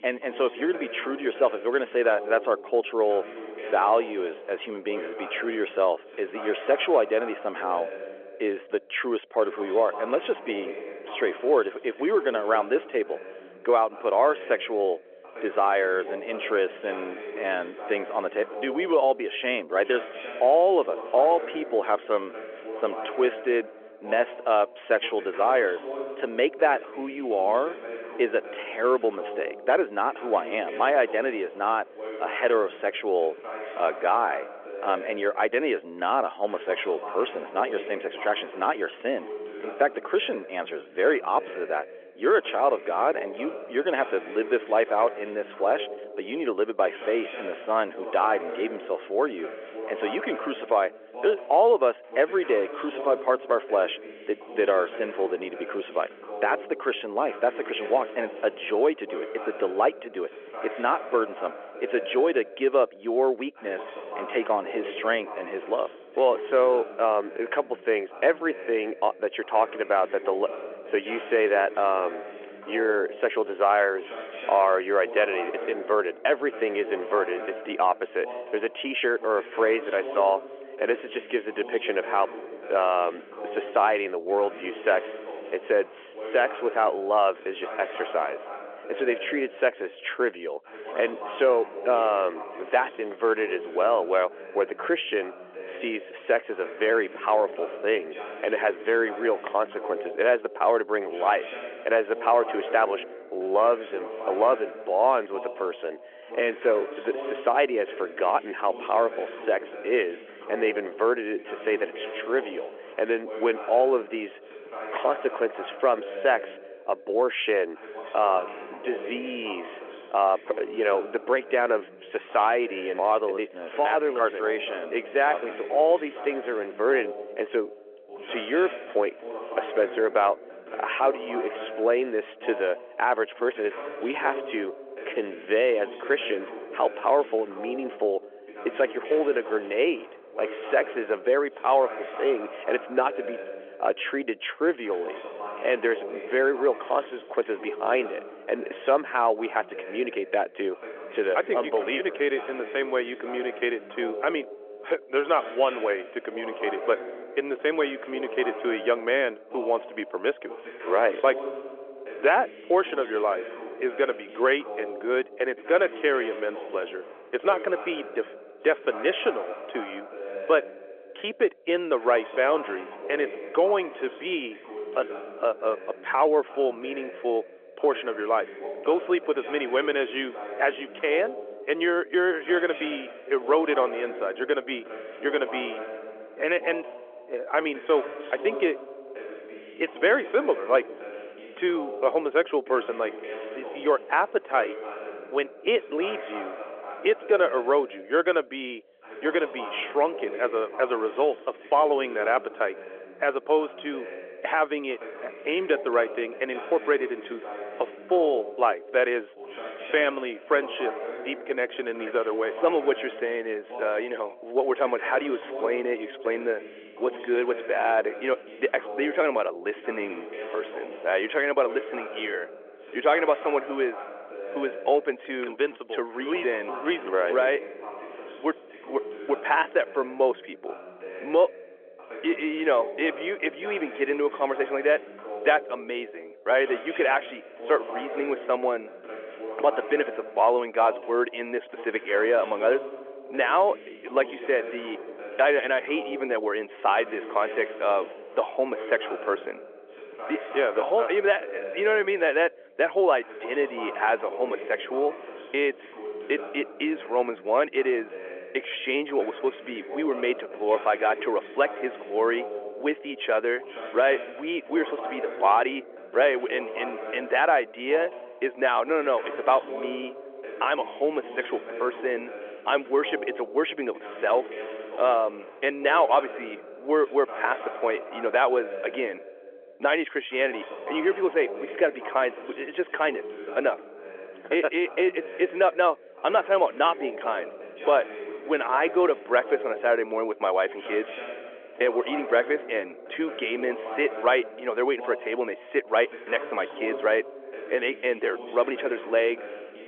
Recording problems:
phone-call audio; nothing above 3.5 kHz
voice in the background; noticeable; throughout; 10 dB below the speech

